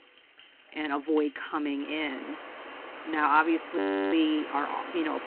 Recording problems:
phone-call audio
rain or running water; noticeable; throughout; 15 dB below the speech
audio freezing; at 4 s

